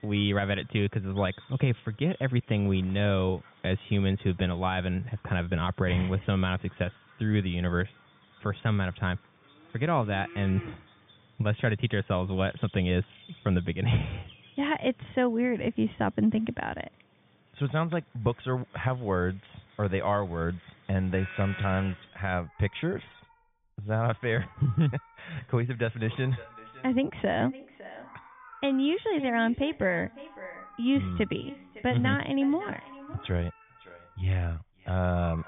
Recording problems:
high frequencies cut off; severe; nothing above 3.5 kHz
echo of what is said; faint; from 26 s on; 560 ms later, 20 dB below the speech
animal sounds; faint; throughout; 20 dB below the speech

